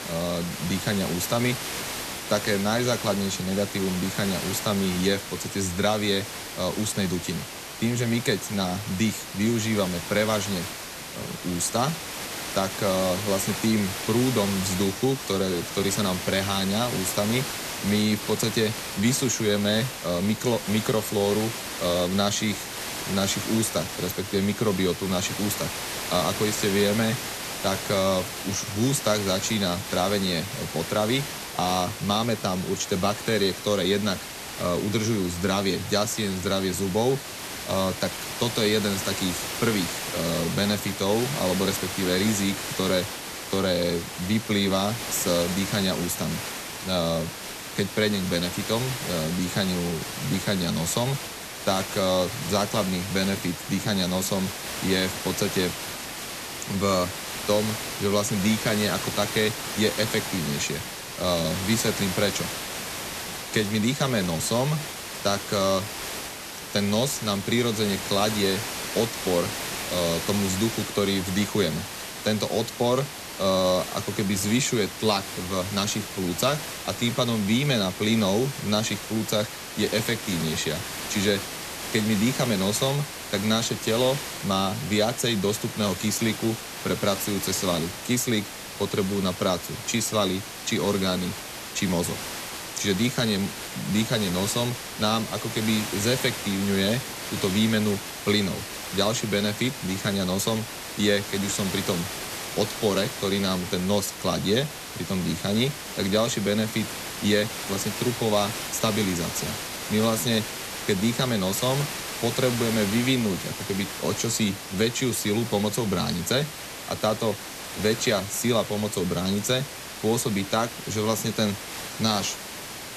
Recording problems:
hiss; loud; throughout; 6 dB below the speech

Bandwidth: 14 kHz